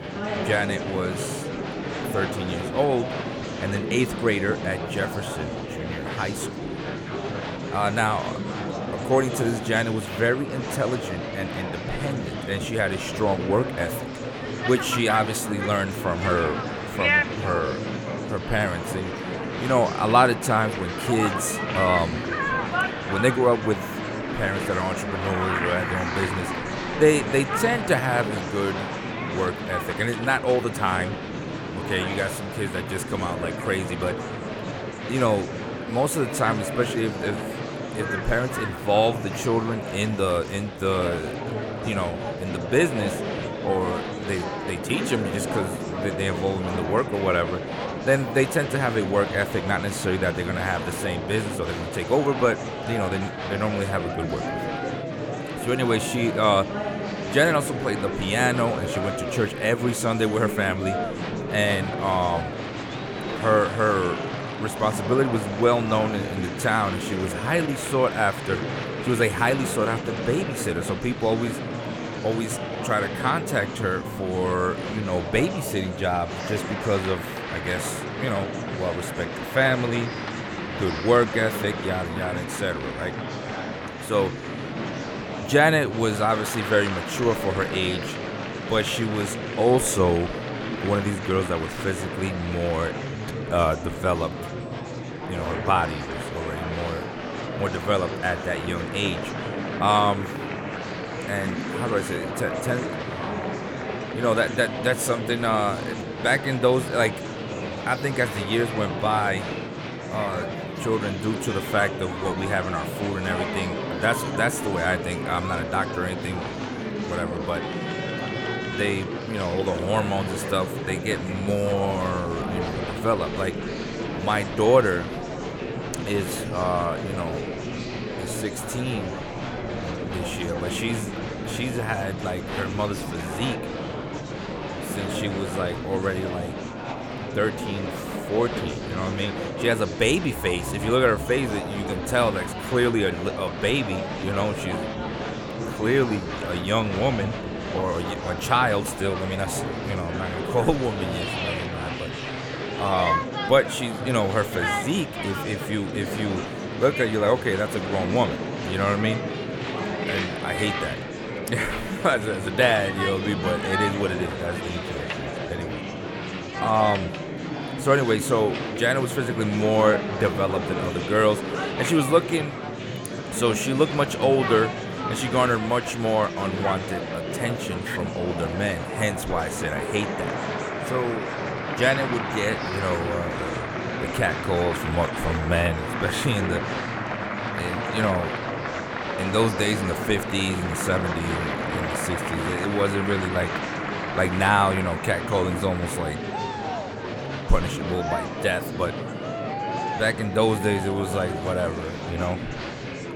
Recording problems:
murmuring crowd; loud; throughout; 4 dB below the speech

